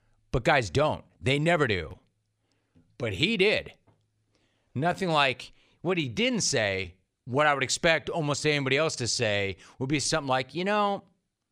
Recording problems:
uneven, jittery; strongly; from 1 to 11 s

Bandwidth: 15 kHz